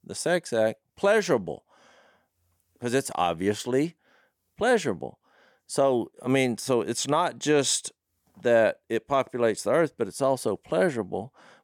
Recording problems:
none

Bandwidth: 18 kHz